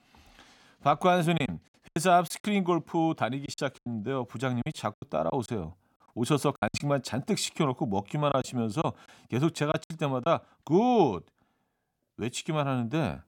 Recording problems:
choppy; very; from 1.5 to 2.5 s, from 3.5 to 7 s and from 8.5 to 10 s; 13% of the speech affected

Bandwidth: 17.5 kHz